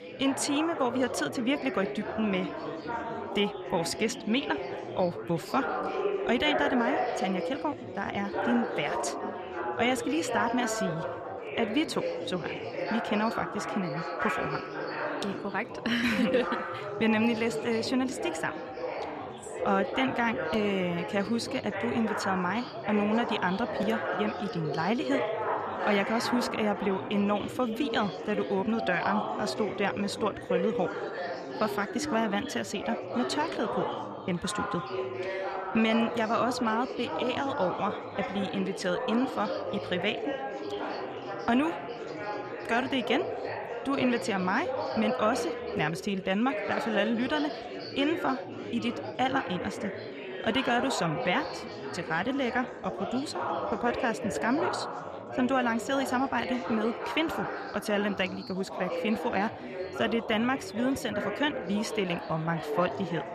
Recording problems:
chatter from many people; loud; throughout; 4 dB below the speech

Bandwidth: 14 kHz